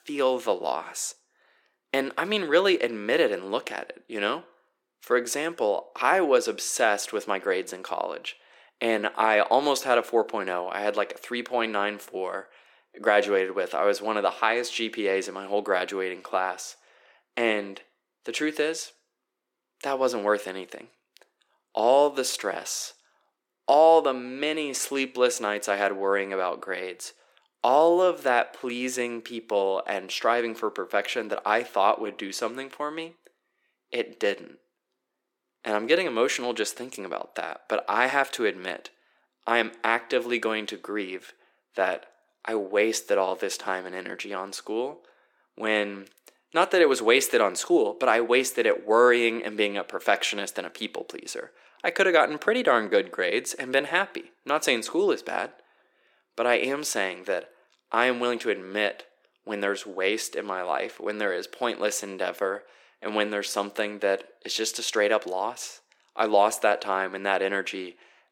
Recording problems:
thin; somewhat; fading below 300 Hz

